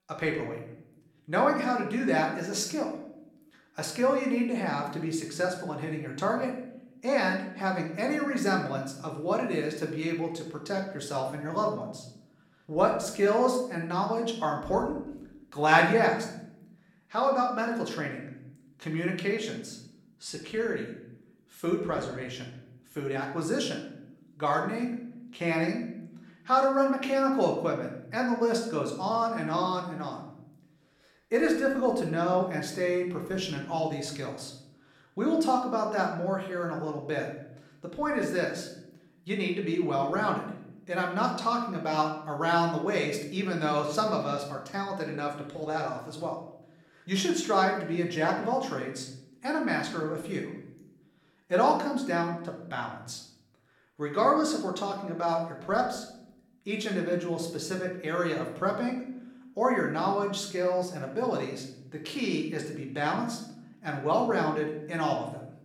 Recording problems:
room echo; slight; dies away in 0.7 s
off-mic speech; somewhat distant

